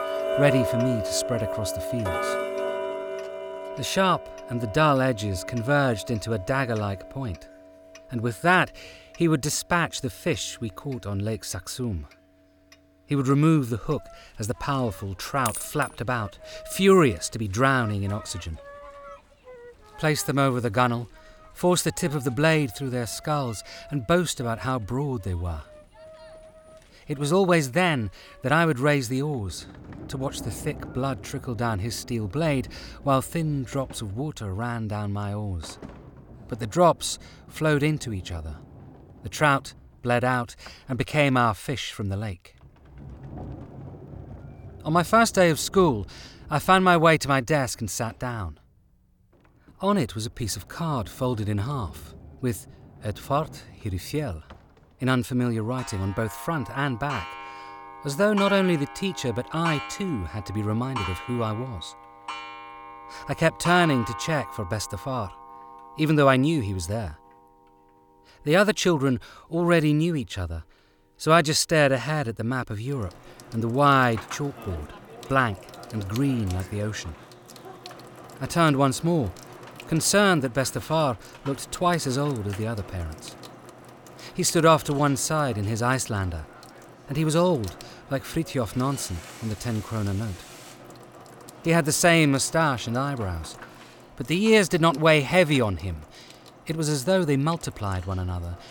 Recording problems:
household noises; noticeable; throughout; 15 dB below the speech

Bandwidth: 18 kHz